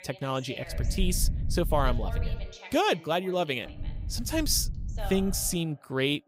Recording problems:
voice in the background; noticeable; throughout; 15 dB below the speech
low rumble; faint; from 1 to 2.5 s and from 3.5 to 5.5 s; 20 dB below the speech

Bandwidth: 15.5 kHz